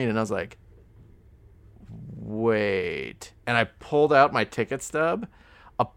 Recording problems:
abrupt cut into speech; at the start

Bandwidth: 16.5 kHz